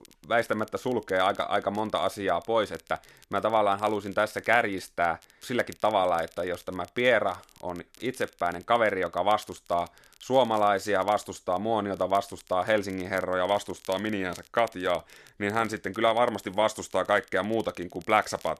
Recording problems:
crackle, like an old record; faint; 25 dB below the speech

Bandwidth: 13.5 kHz